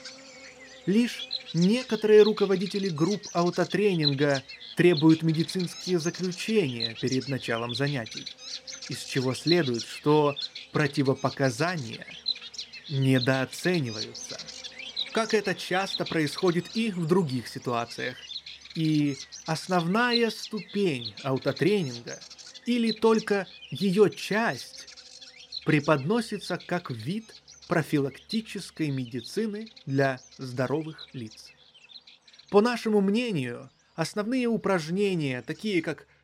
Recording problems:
animal sounds; noticeable; throughout; 10 dB below the speech

